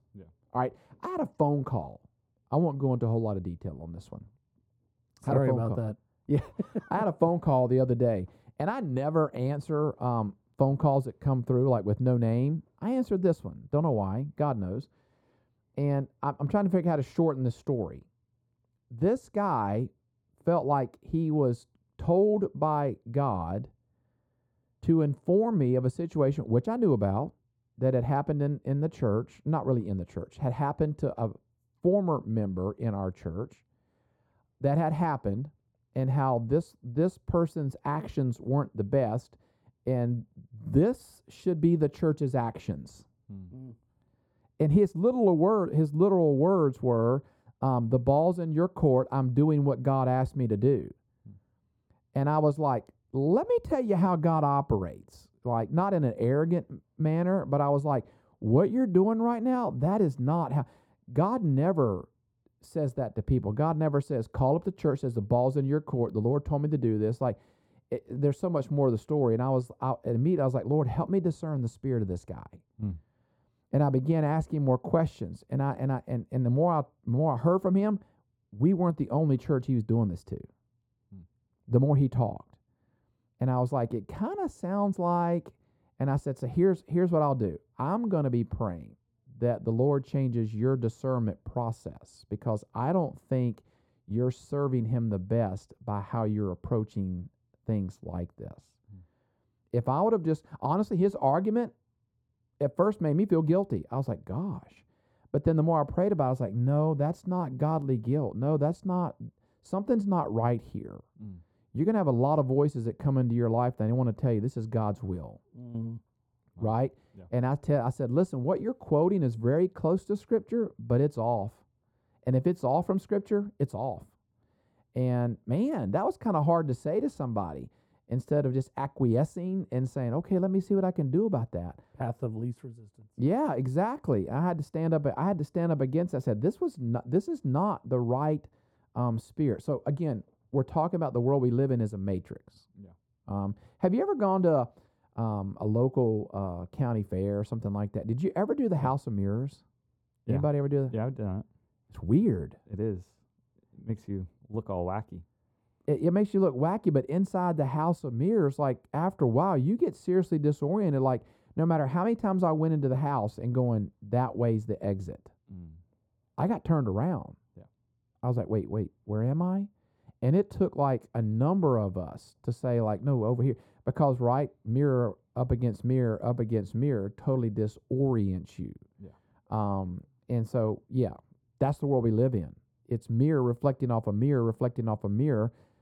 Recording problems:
muffled; very; fading above 1 kHz

